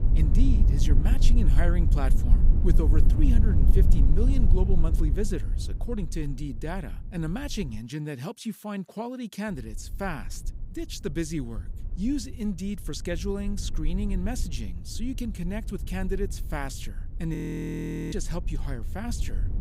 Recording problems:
low rumble; loud; until 8 s and from 9.5 s on; 7 dB below the speech
audio freezing; at 17 s for 1 s

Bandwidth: 15.5 kHz